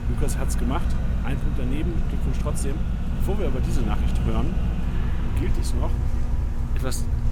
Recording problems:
traffic noise; loud; throughout; as loud as the speech
electrical hum; very faint; throughout; 60 Hz, 7 dB below the speech

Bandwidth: 18.5 kHz